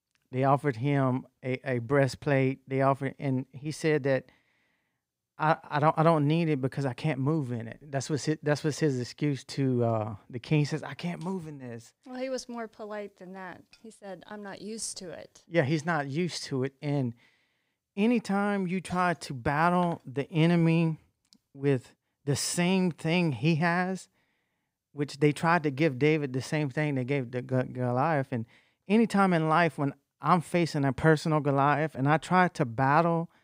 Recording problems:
none

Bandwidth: 15.5 kHz